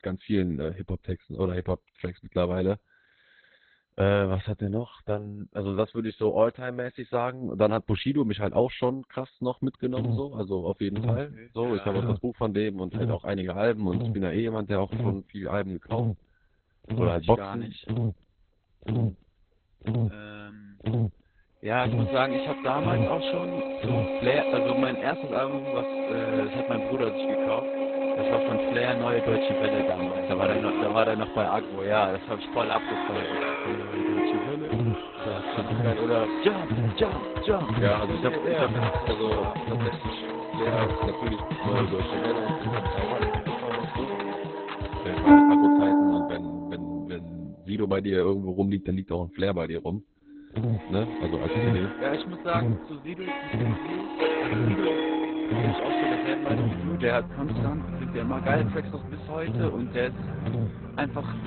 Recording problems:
garbled, watery; badly; nothing above 4 kHz
background music; very loud; from 22 s on; 1 dB above the speech
electrical hum; loud; from 9.5 to 25 s, from 34 to 43 s and from 50 s on; 50 Hz, 10 dB below the speech

